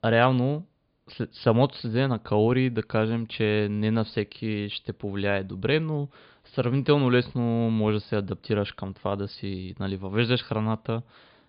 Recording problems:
high frequencies cut off; severe; nothing above 5 kHz

